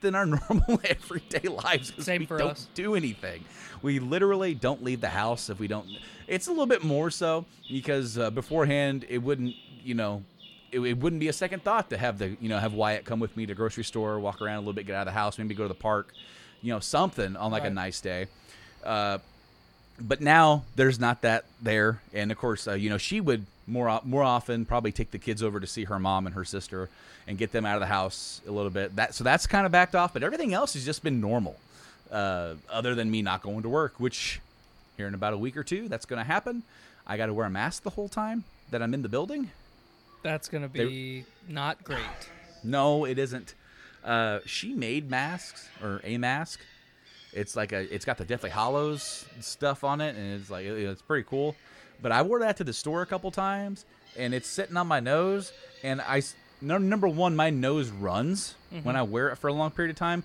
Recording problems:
animal sounds; faint; throughout; 25 dB below the speech

